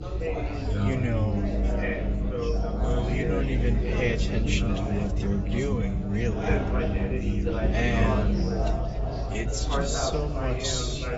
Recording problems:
garbled, watery; badly; nothing above 7.5 kHz
wrong speed, natural pitch; too slow; 0.6 times normal speed
chatter from many people; loud; throughout; 2 dB below the speech
low rumble; loud; throughout; 9 dB below the speech

